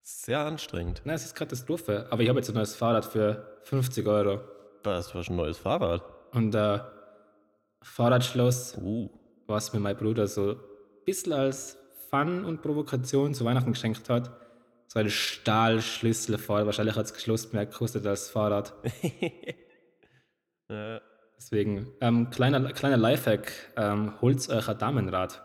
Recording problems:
echo of what is said; faint; throughout; 90 ms later, 20 dB below the speech

